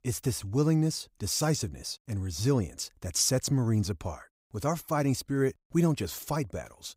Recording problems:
none

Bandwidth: 15.5 kHz